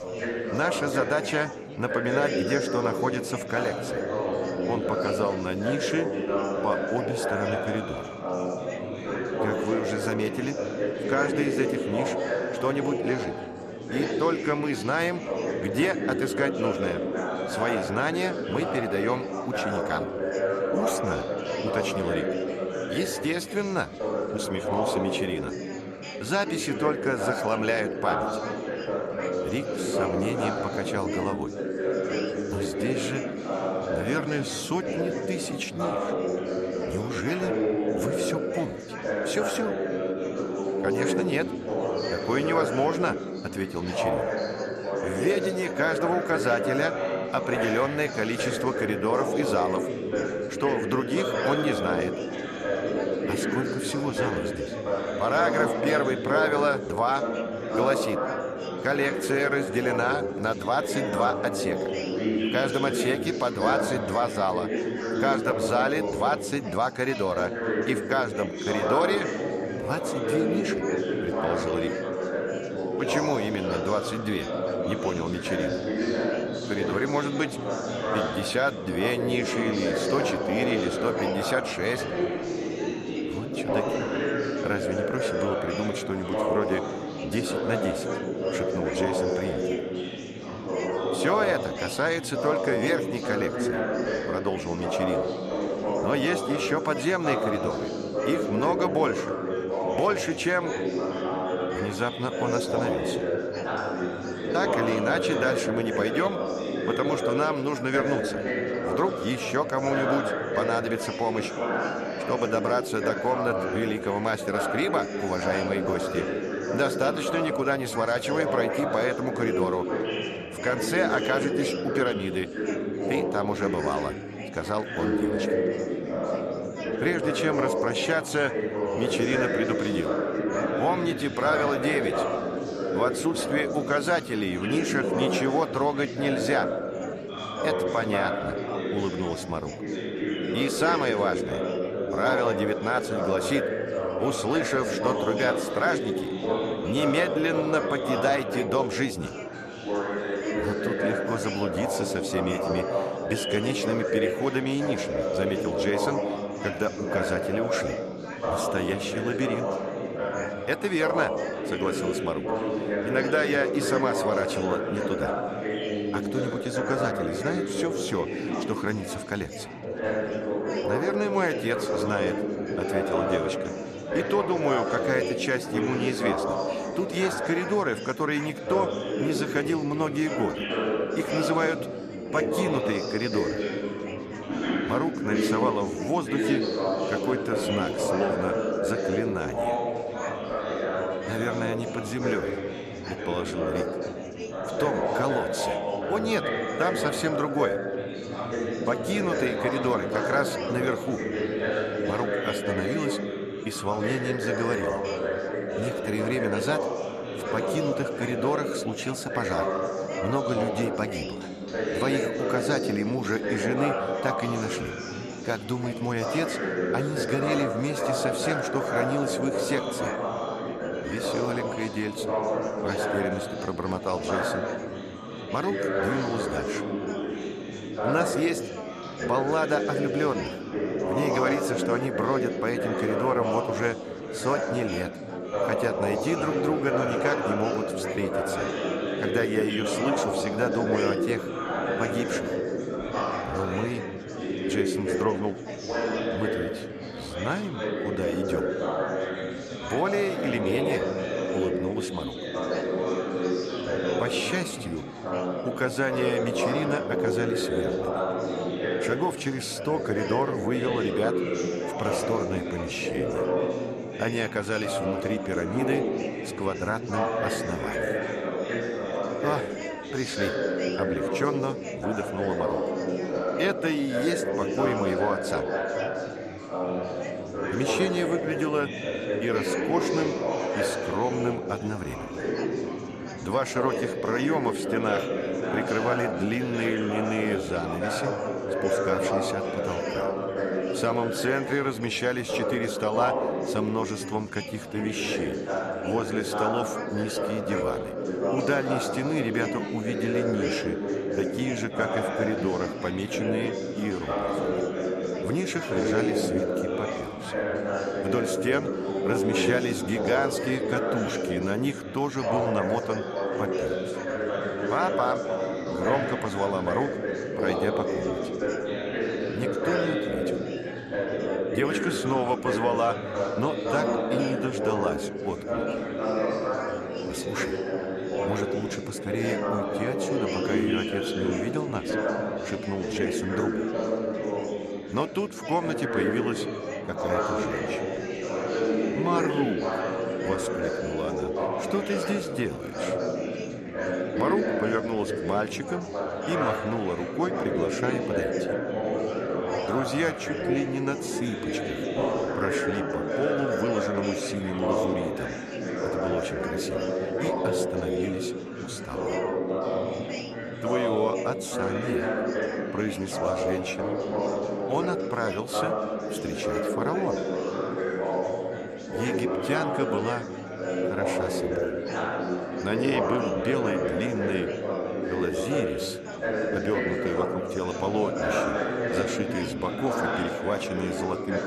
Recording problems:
chatter from many people; very loud; throughout; 1 dB above the speech

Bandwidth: 13.5 kHz